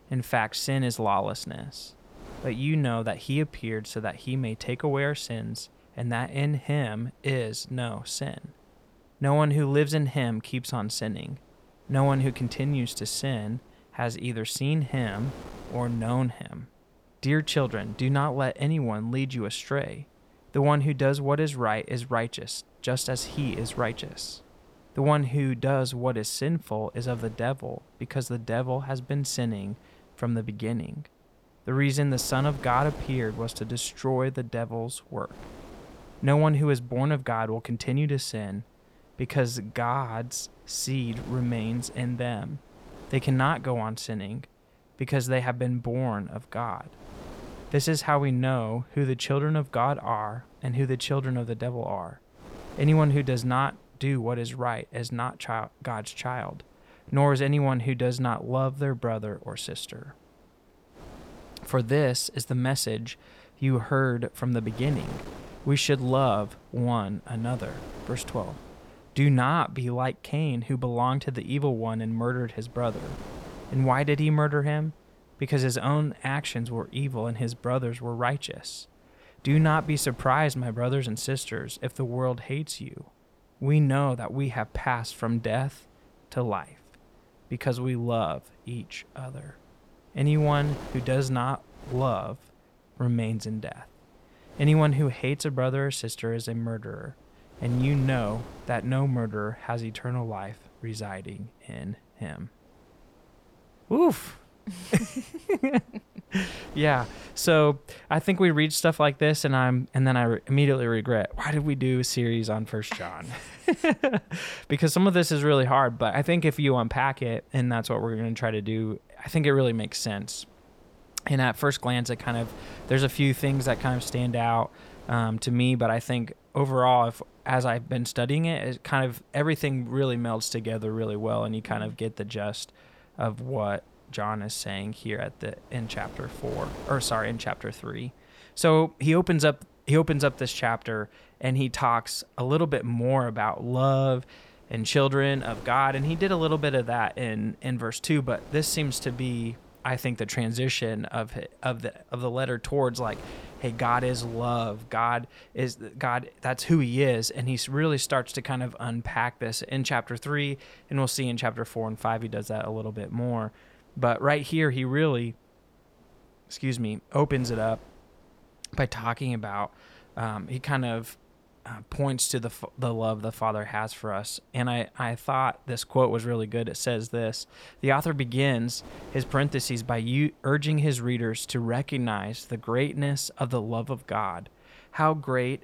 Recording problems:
wind noise on the microphone; occasional gusts; 20 dB below the speech

